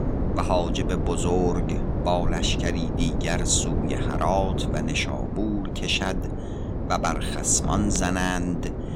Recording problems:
wind noise on the microphone; heavy; 7 dB below the speech

